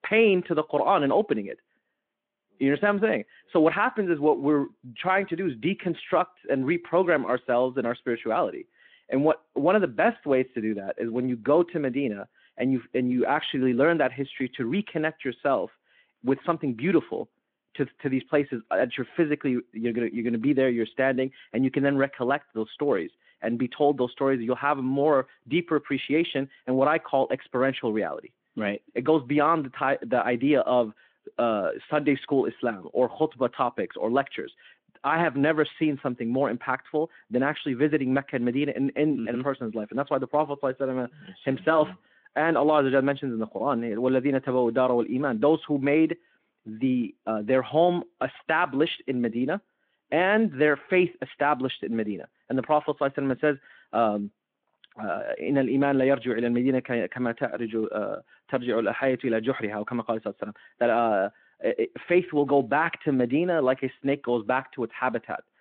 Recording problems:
phone-call audio

